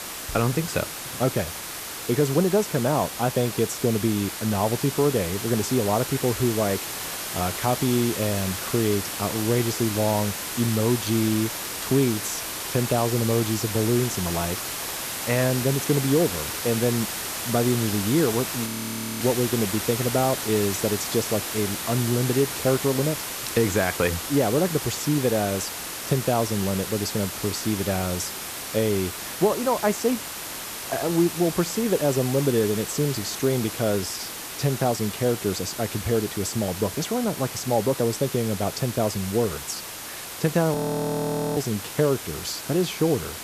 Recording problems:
hiss; loud; throughout; 5 dB below the speech
audio freezing; at 19 s for 0.5 s and at 41 s for 1 s

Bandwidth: 14.5 kHz